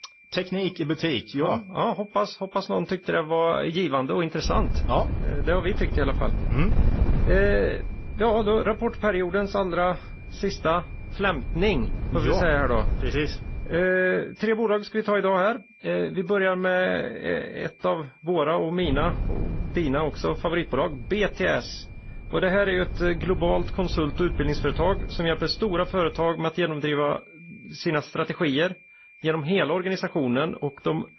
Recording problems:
garbled, watery; slightly; nothing above 6 kHz
wind noise on the microphone; occasional gusts; from 4.5 to 14 s and from 19 to 26 s; 15 dB below the speech
high-pitched whine; faint; throughout; 2.5 kHz, 25 dB below the speech

